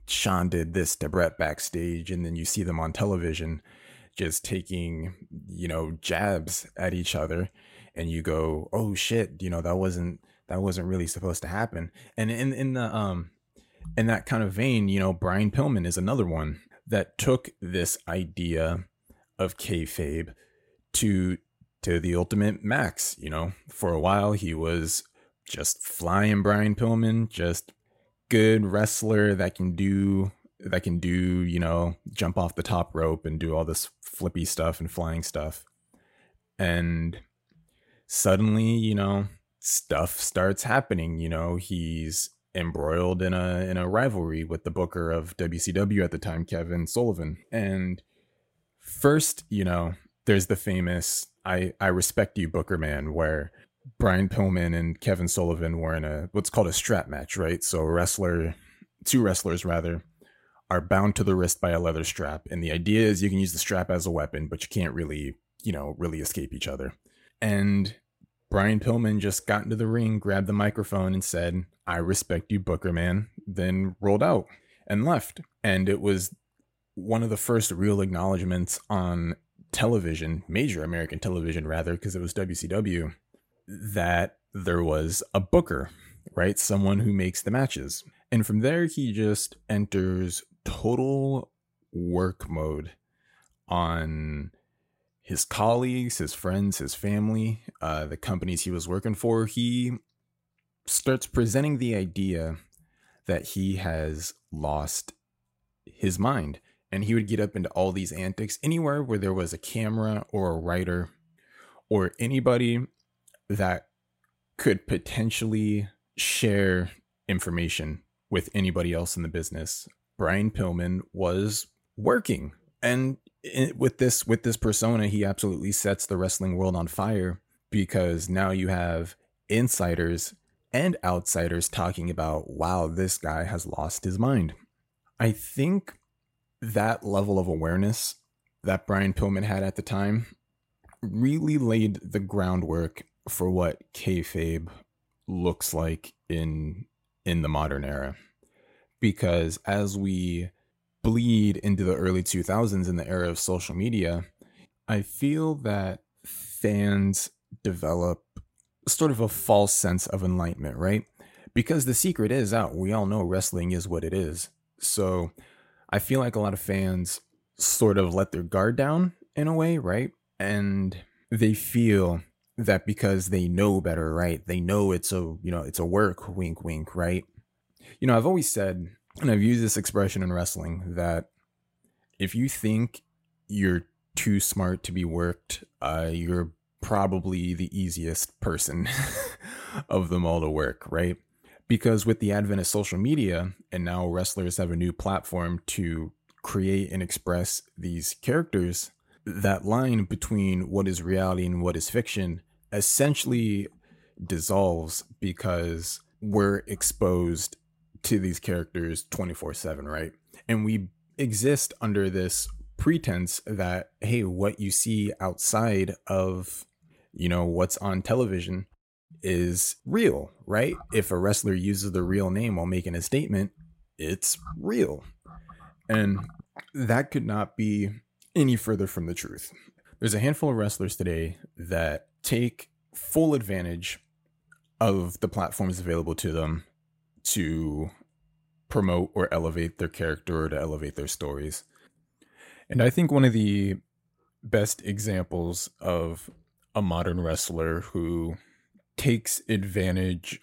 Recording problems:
none

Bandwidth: 16 kHz